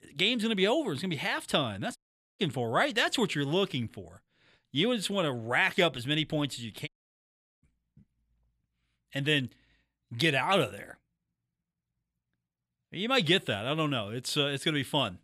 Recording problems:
audio cutting out; at 2 s and at 7 s for 0.5 s

